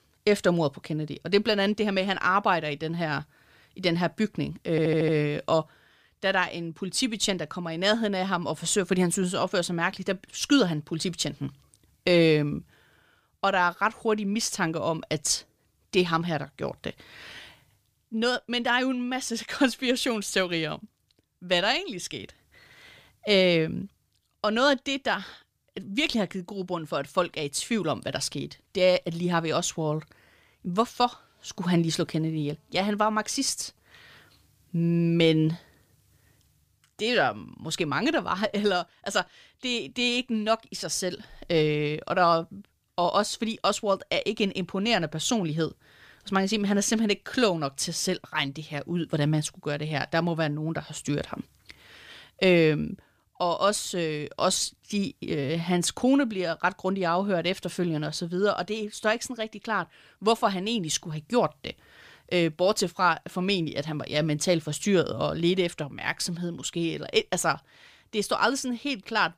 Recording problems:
audio stuttering; at 4.5 s

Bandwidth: 15 kHz